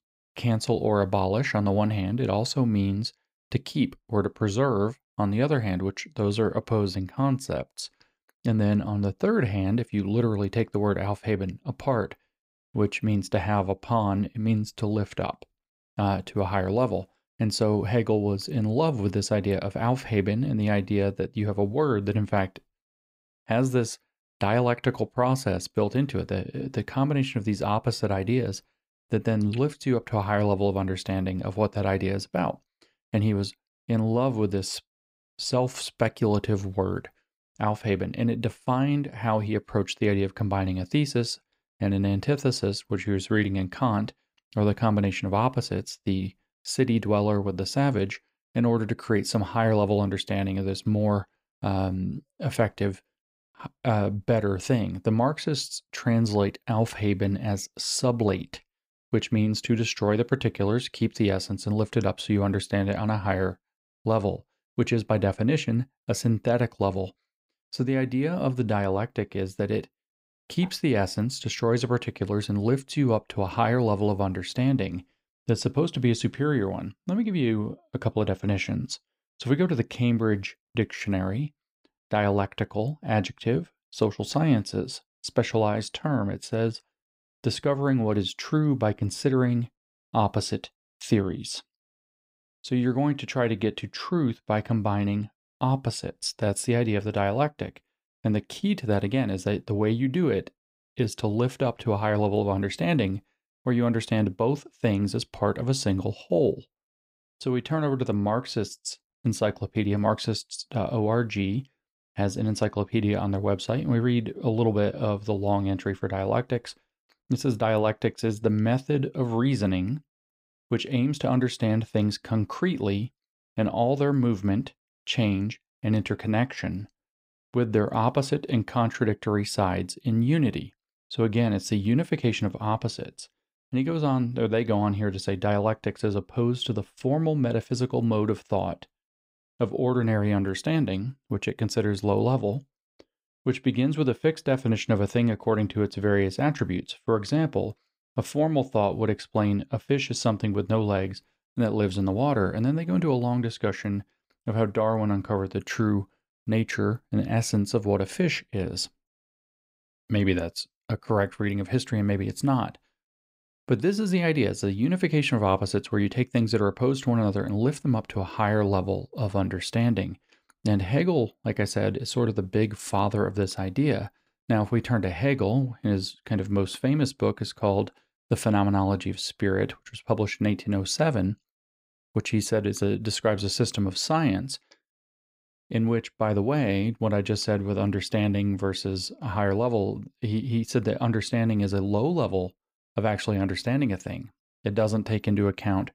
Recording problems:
none

